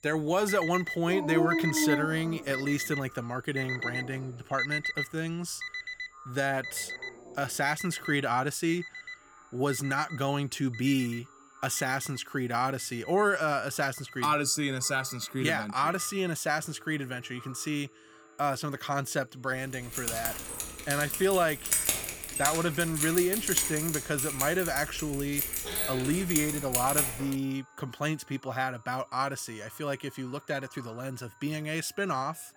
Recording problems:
echo of what is said; faint; throughout; 520 ms later, 25 dB below the speech
alarms or sirens; loud; throughout; 7 dB below the speech
high-pitched whine; faint; throughout; 7 kHz, 35 dB below the speech
dog barking; loud; from 1 to 7 s; peak 3 dB above the speech
jangling keys; loud; from 20 to 27 s; peak 6 dB above the speech

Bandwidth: 18 kHz